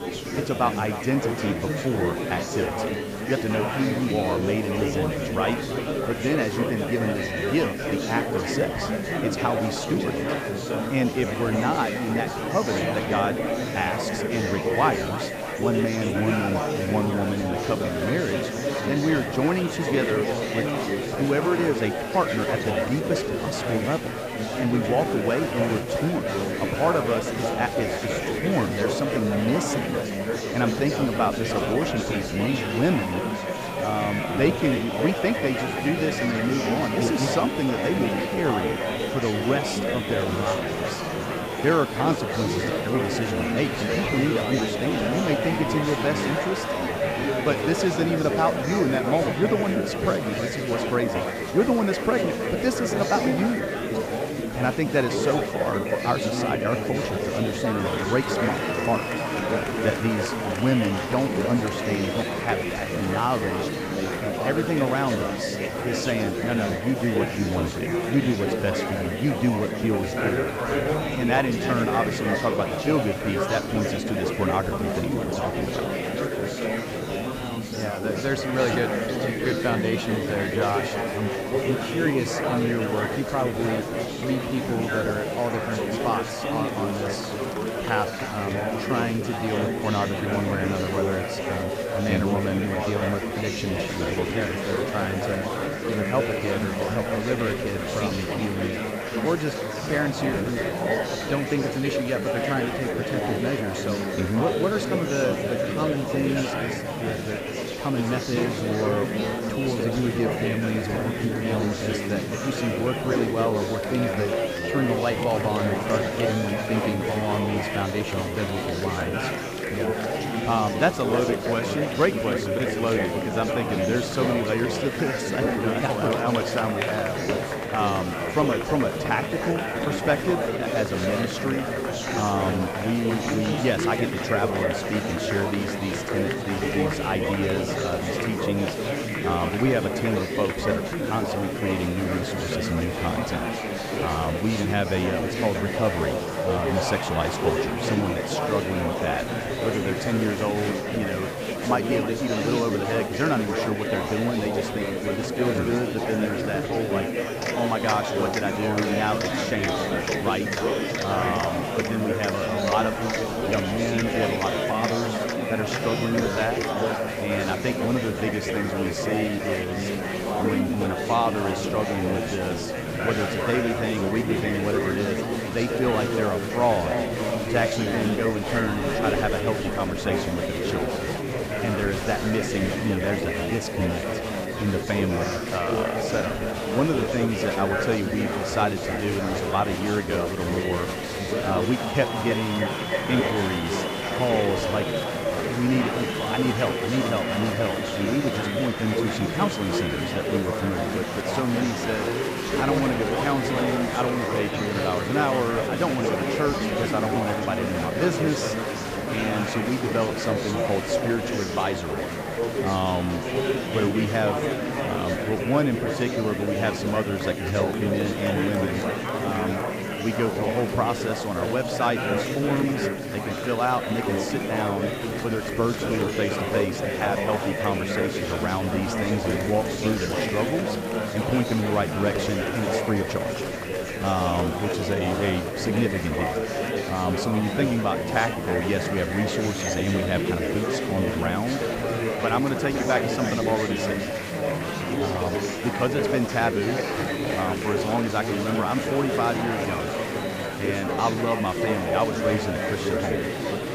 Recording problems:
echo of what is said; strong; throughout; 310 ms later, 8 dB below the speech
murmuring crowd; loud; throughout; as loud as the speech
hiss; faint; throughout; 20 dB below the speech

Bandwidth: 15 kHz